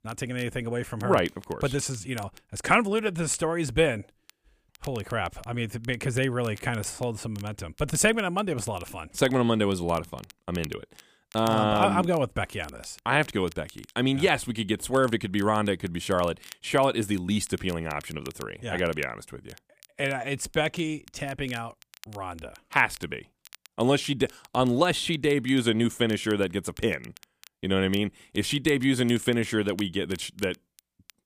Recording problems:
crackle, like an old record; faint; 25 dB below the speech

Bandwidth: 15 kHz